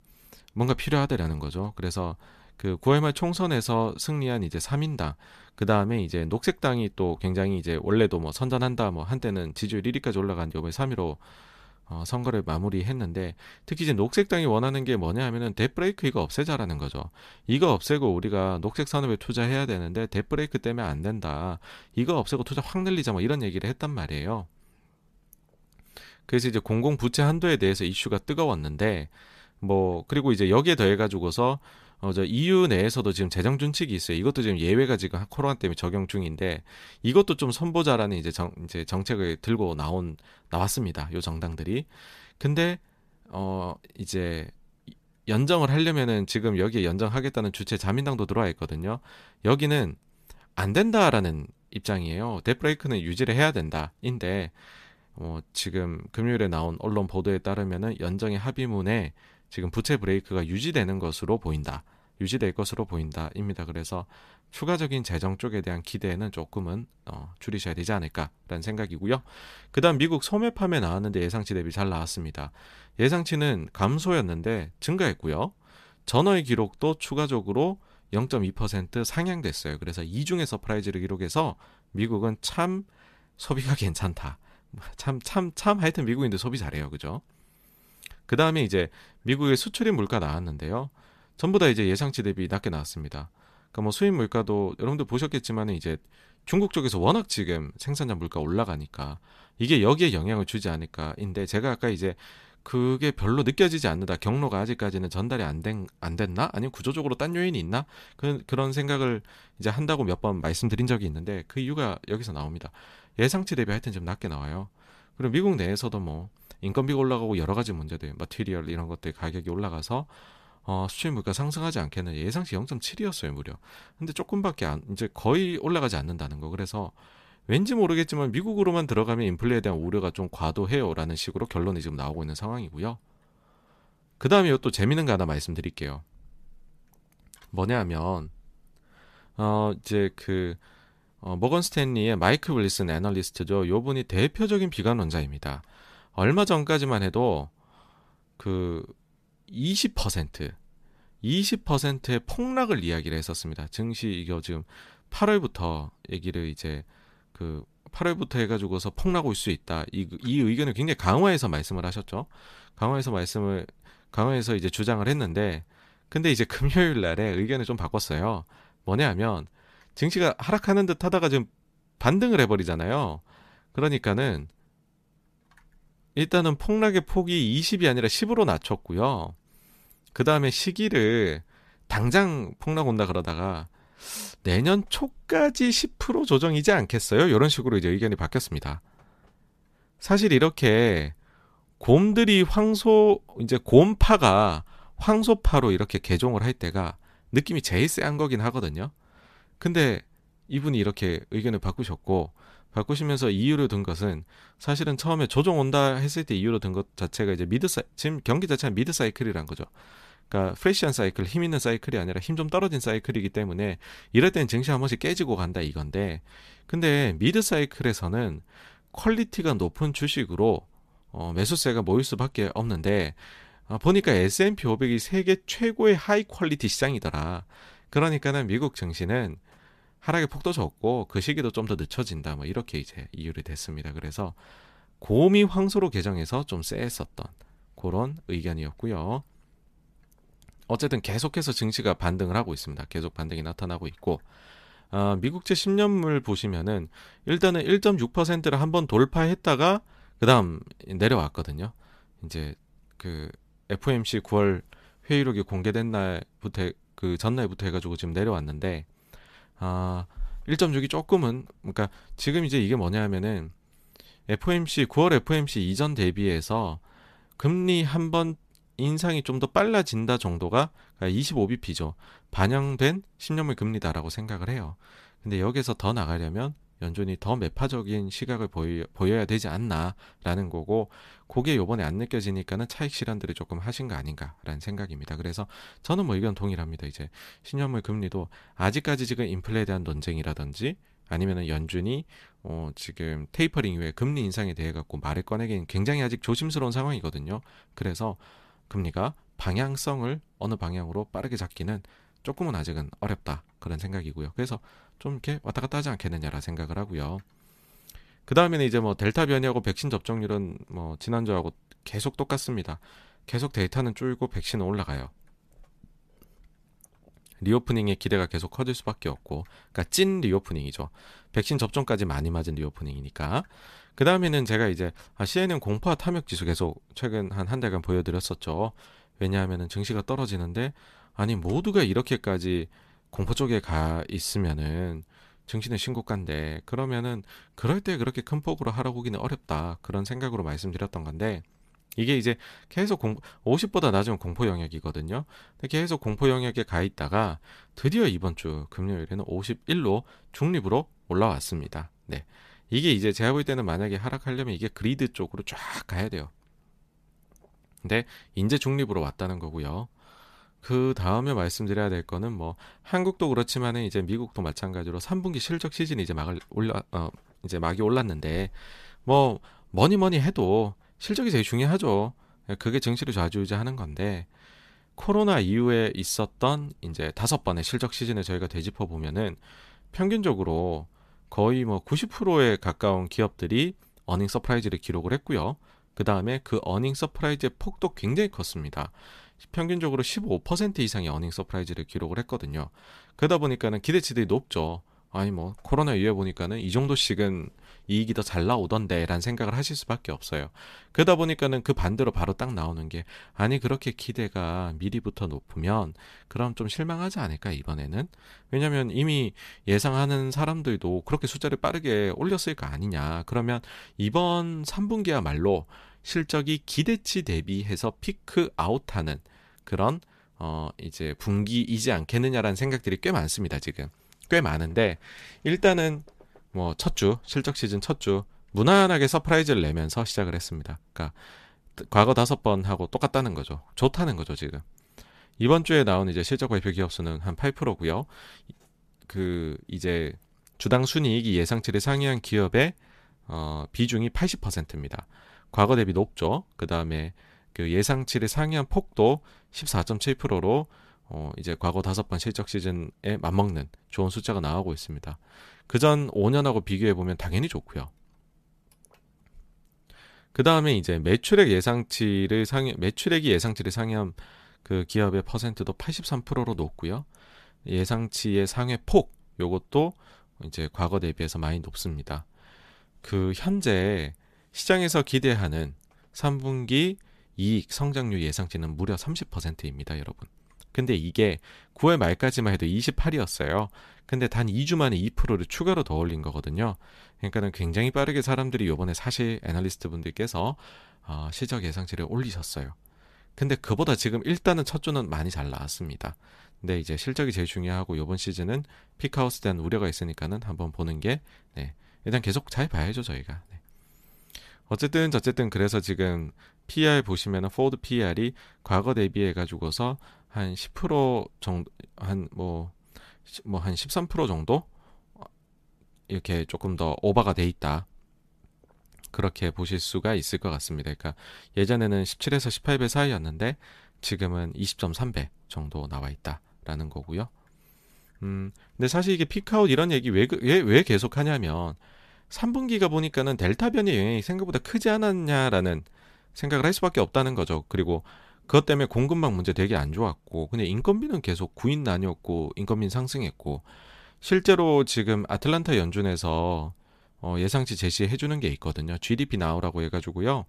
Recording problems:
none

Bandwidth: 14.5 kHz